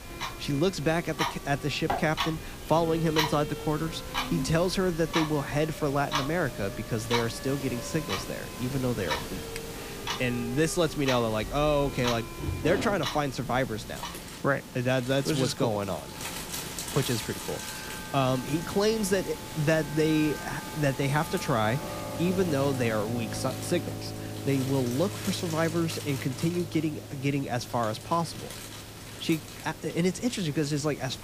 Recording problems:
household noises; loud; throughout; 8 dB below the speech
background music; noticeable; throughout; 15 dB below the speech
hiss; noticeable; throughout; 15 dB below the speech

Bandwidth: 15 kHz